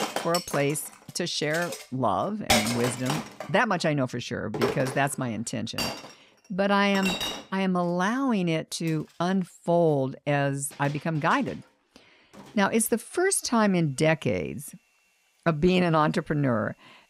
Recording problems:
household noises; loud; throughout; 5 dB below the speech

